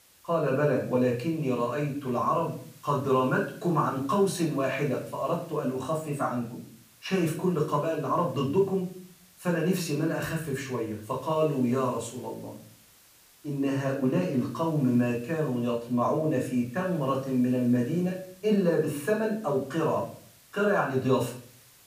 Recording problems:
off-mic speech; far
room echo; slight; dies away in 0.4 s
hiss; faint; throughout; 25 dB below the speech

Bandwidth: 15 kHz